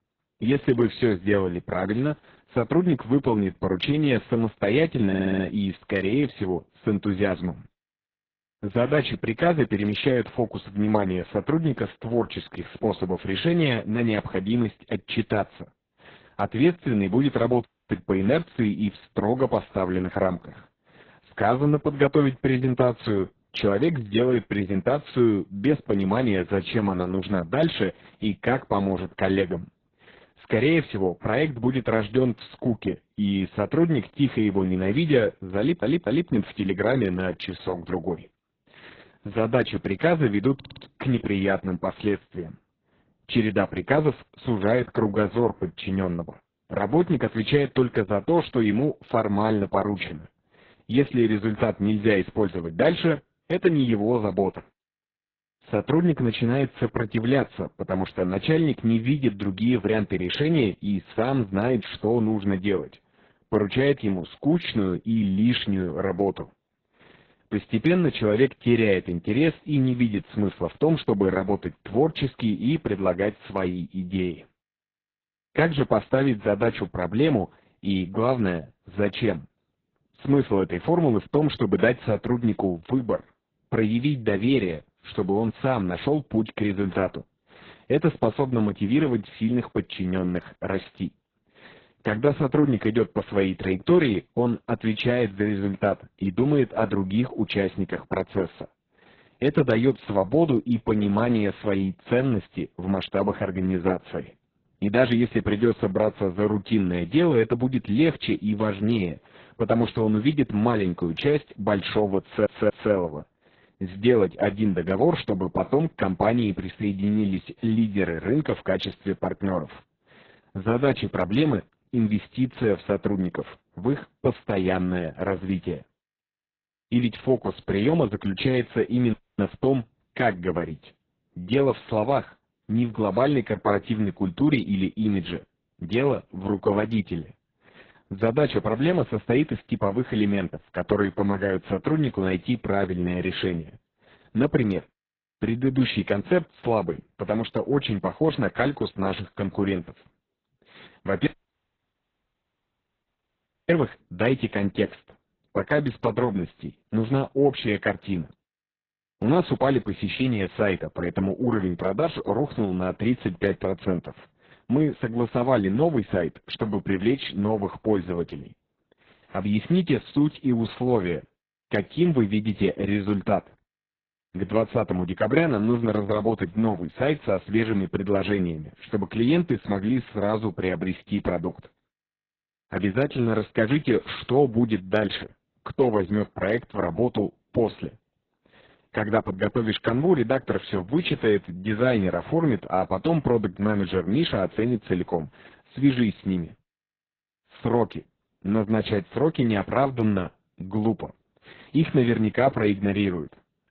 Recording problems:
garbled, watery; badly
audio stuttering; 4 times, first at 5 s
audio cutting out; at 18 s, at 2:09 and at 2:31 for 2.5 s

